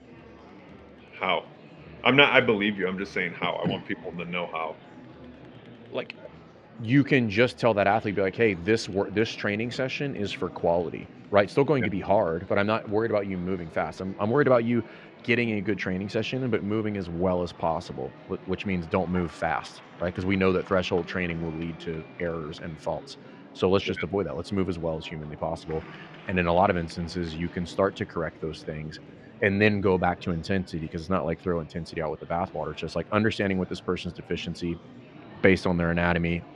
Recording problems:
muffled; slightly; fading above 3 kHz
murmuring crowd; faint; throughout; 20 dB below the speech

